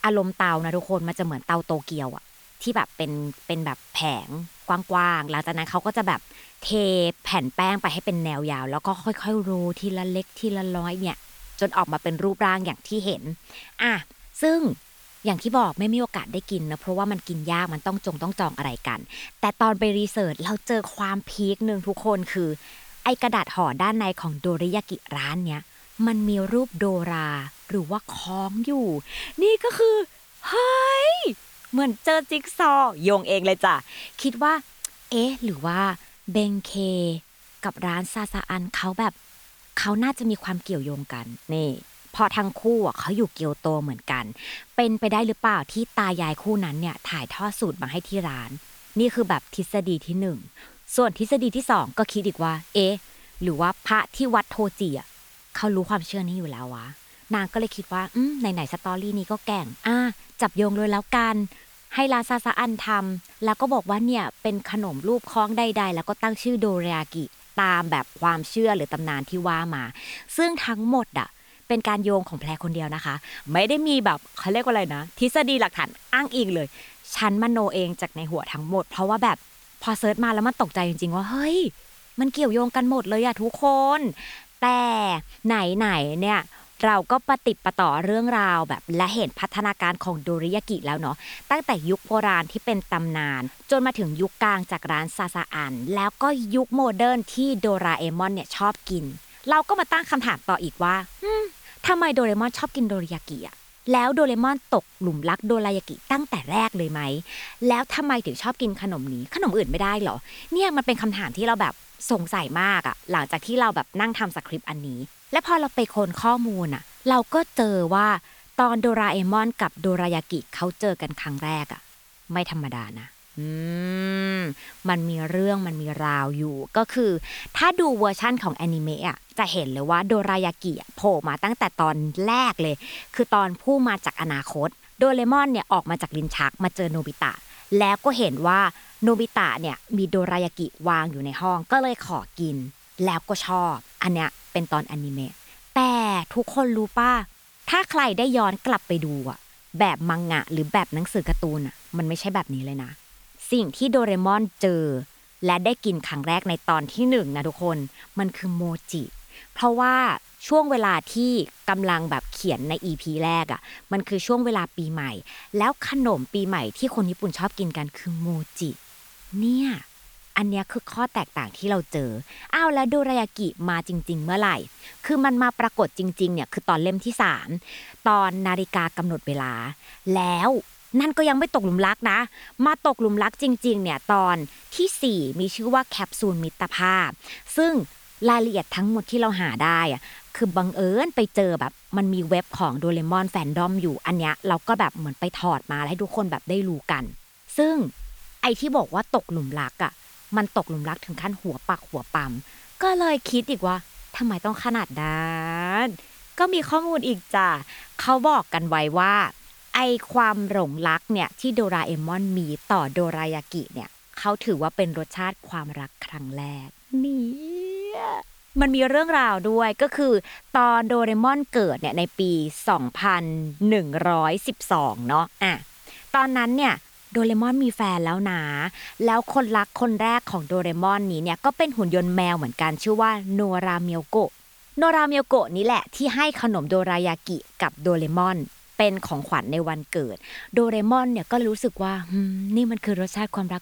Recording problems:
hiss; faint; throughout; 25 dB below the speech

